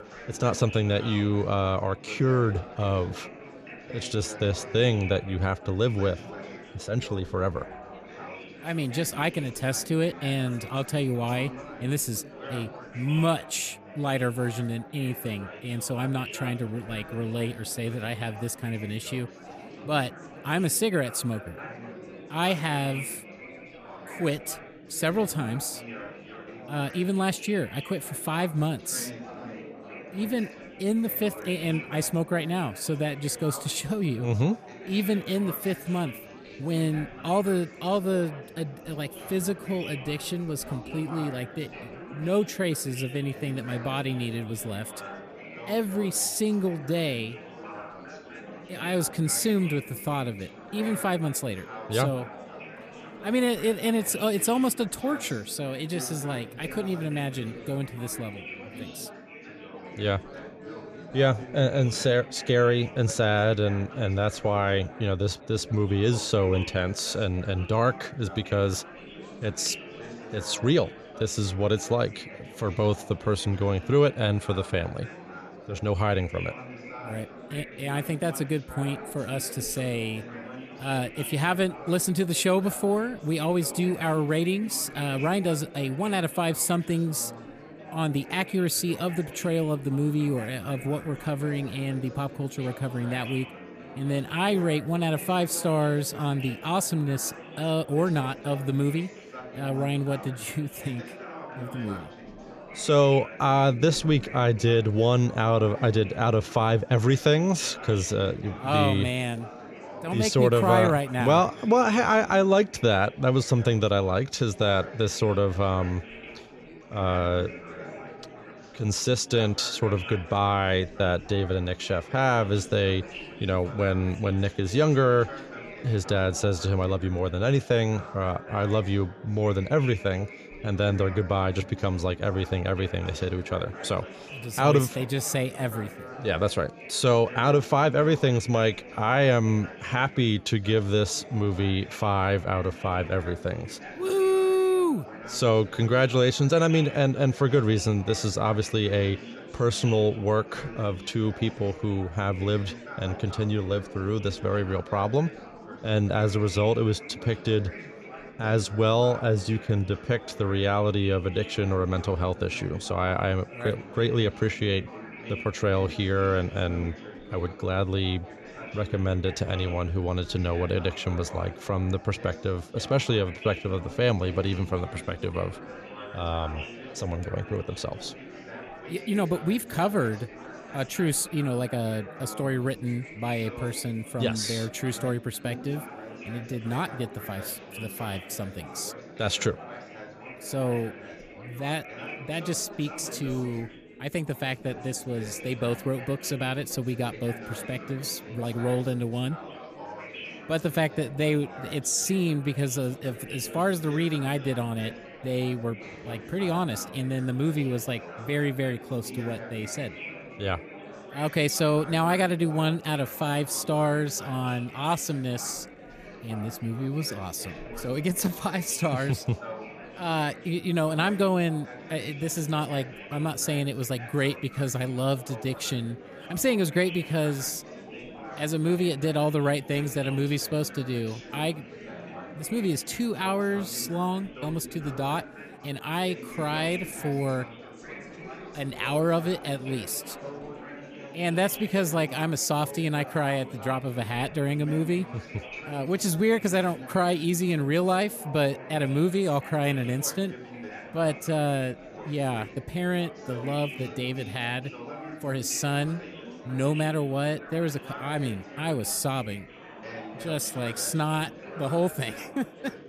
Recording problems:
chatter from many people; noticeable; throughout; 15 dB below the speech

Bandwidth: 14.5 kHz